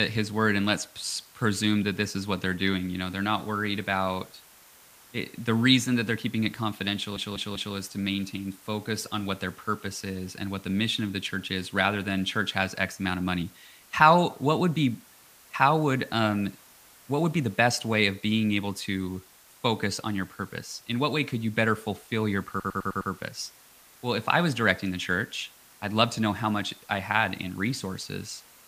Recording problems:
hiss; faint; throughout; 25 dB below the speech
abrupt cut into speech; at the start
audio stuttering; at 7 s and at 23 s

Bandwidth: 15 kHz